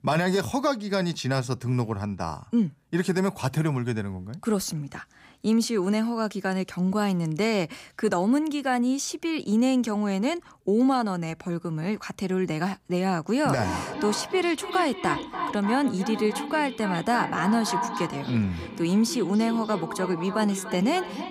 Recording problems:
echo of what is said; strong; from 14 s on; 290 ms later, 8 dB below the speech

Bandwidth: 15 kHz